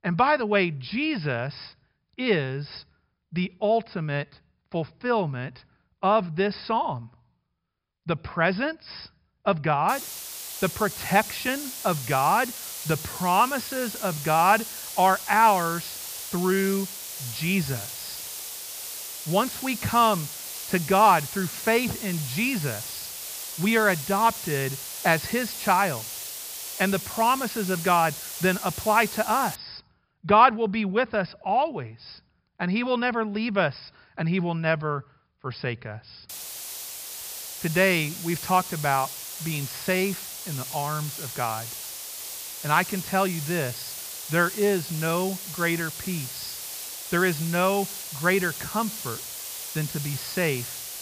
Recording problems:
high frequencies cut off; noticeable; nothing above 5.5 kHz
hiss; loud; from 10 to 30 s and from 36 s on; 8 dB below the speech

